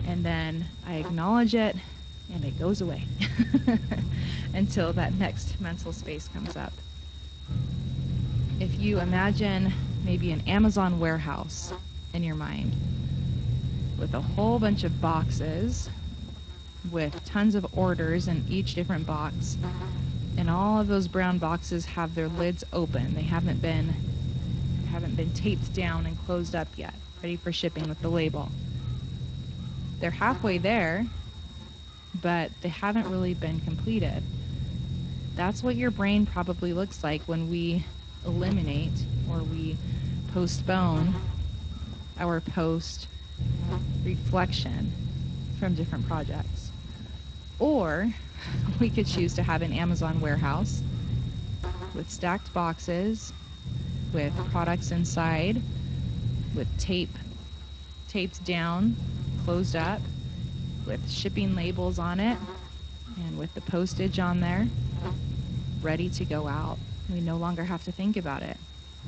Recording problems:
garbled, watery; slightly; nothing above 7.5 kHz
electrical hum; noticeable; throughout; 60 Hz, 20 dB below the speech
high-pitched whine; noticeable; throughout; 3.5 kHz, 20 dB below the speech
low rumble; noticeable; throughout; 15 dB below the speech

